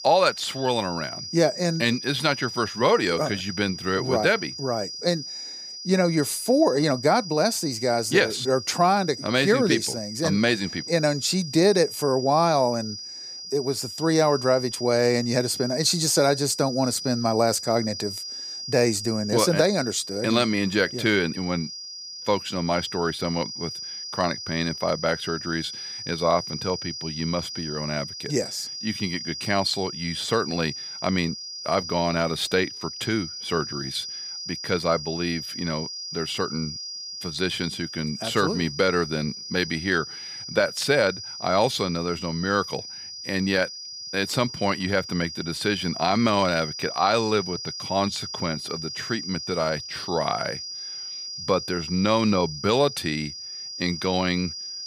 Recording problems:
high-pitched whine; loud; throughout; 5 kHz, 8 dB below the speech

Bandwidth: 15 kHz